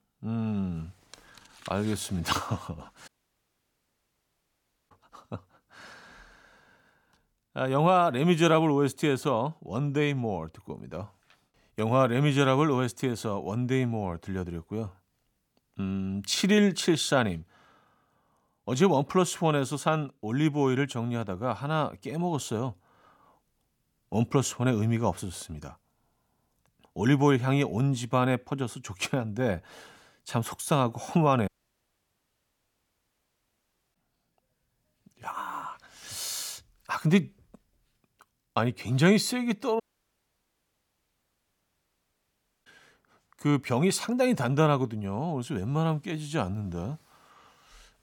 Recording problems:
audio cutting out; at 3 s for 2 s, at 31 s for 2.5 s and at 40 s for 3 s

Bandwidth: 18 kHz